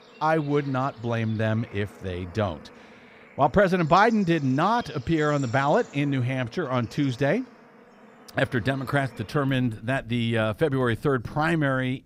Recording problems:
animal sounds; faint; throughout; 20 dB below the speech

